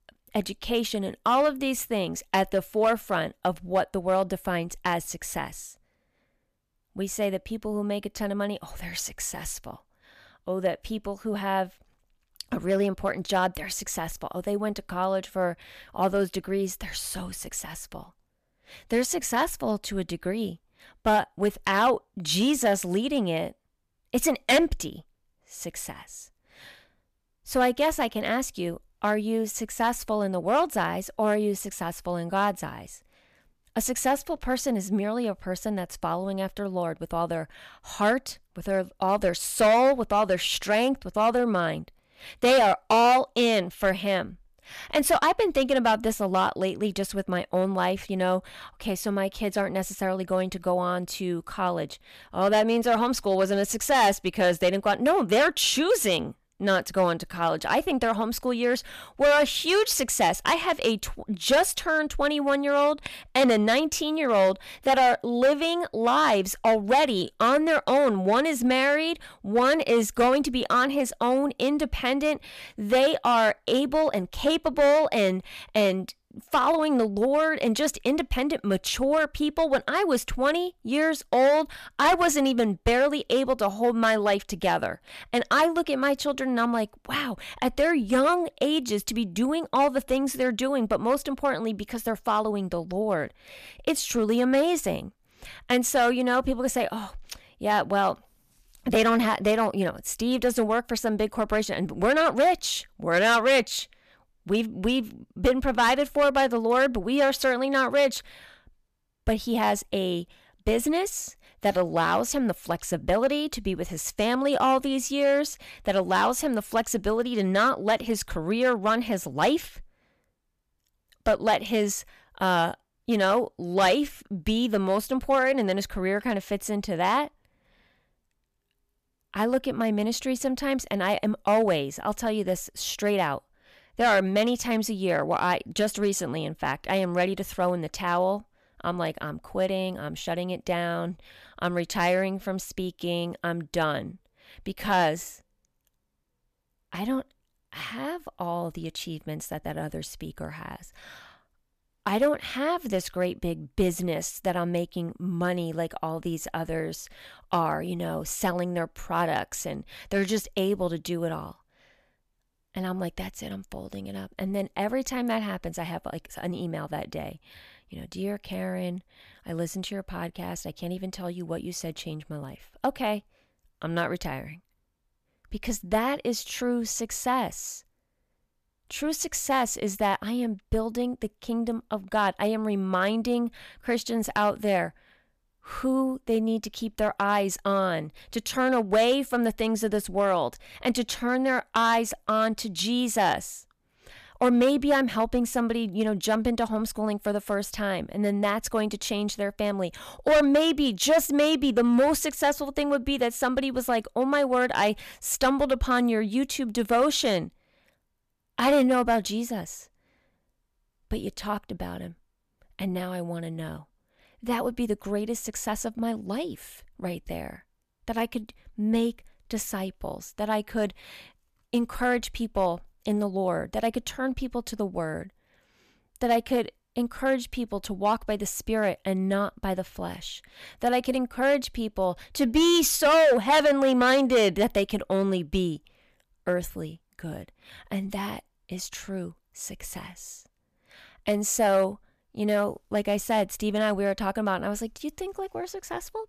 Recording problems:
distortion; slight; 3% of the sound clipped

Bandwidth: 14.5 kHz